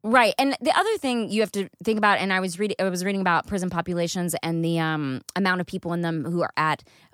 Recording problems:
none

